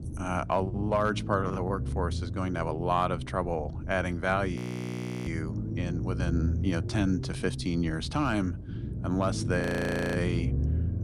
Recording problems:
low rumble; noticeable; throughout; 15 dB below the speech
audio freezing; at 4.5 s for 0.5 s and at 9.5 s for 0.5 s

